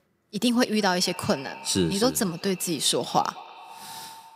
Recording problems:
echo of what is said; faint; throughout; 200 ms later, 20 dB below the speech

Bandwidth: 15.5 kHz